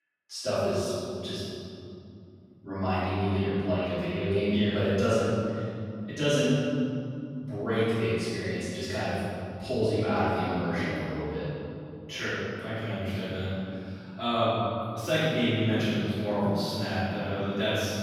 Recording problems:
room echo; strong; dies away in 2.8 s
off-mic speech; far

